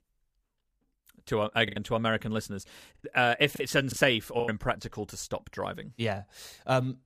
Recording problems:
choppy; very; from 1.5 to 4.5 s; 9% of the speech affected

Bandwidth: 15 kHz